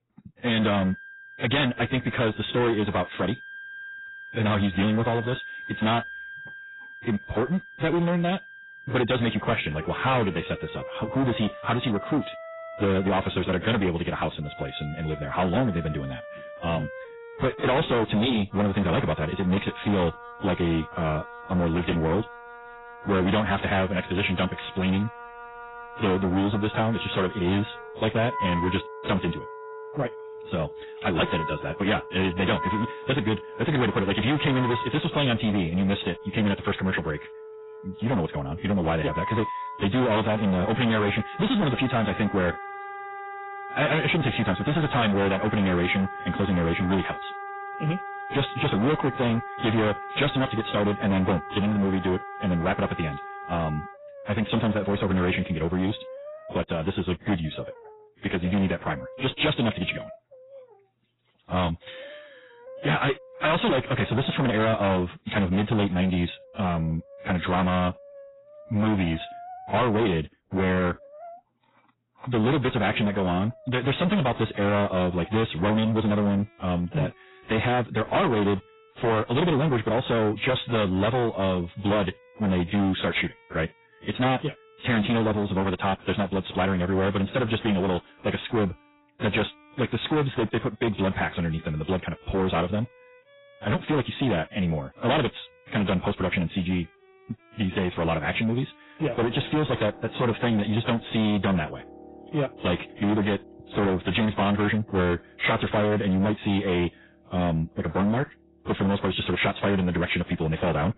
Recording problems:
distortion; heavy; 17% of the sound clipped
garbled, watery; badly; nothing above 4 kHz
wrong speed, natural pitch; too fast; 1.5 times normal speed
background music; noticeable; throughout; 15 dB below the speech

